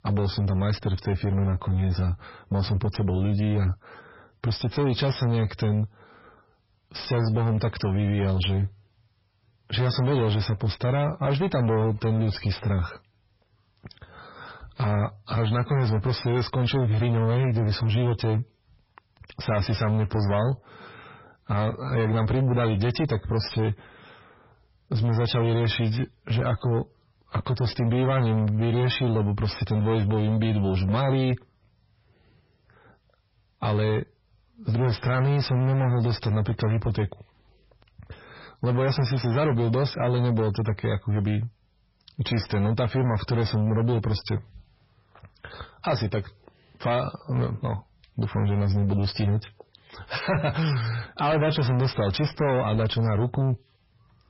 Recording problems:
garbled, watery; badly; nothing above 5.5 kHz
distortion; slight; 10 dB below the speech

